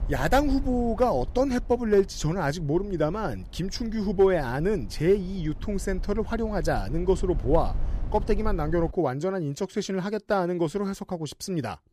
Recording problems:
low rumble; faint; until 9 s; 25 dB below the speech

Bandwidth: 14.5 kHz